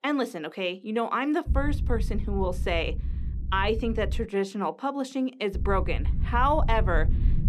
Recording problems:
low rumble; noticeable; from 1.5 to 4 s and from 5.5 s on; 20 dB below the speech

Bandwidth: 14.5 kHz